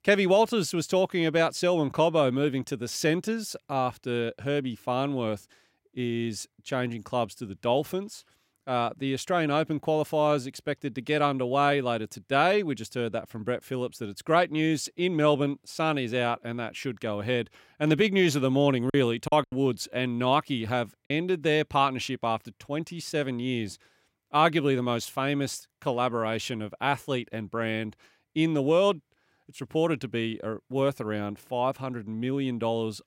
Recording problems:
choppy; occasionally; from 19 to 21 s; 5% of the speech affected

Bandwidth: 16 kHz